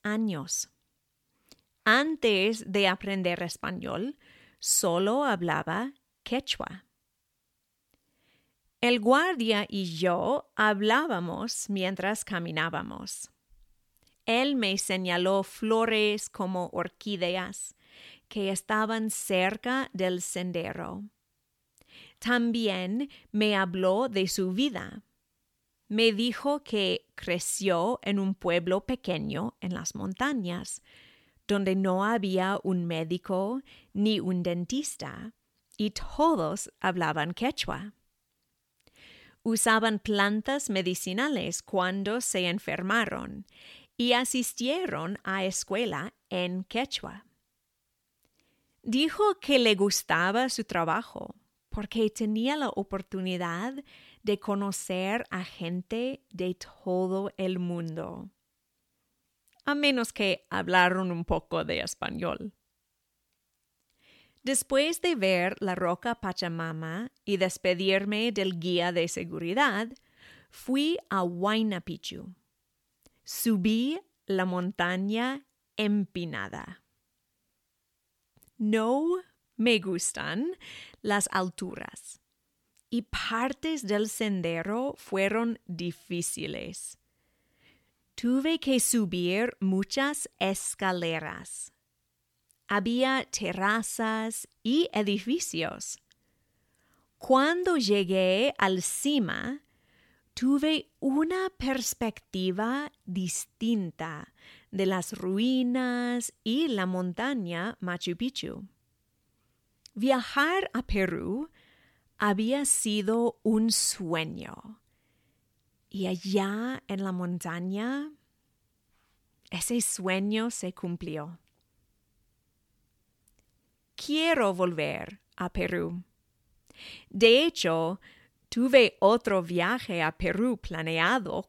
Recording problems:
none

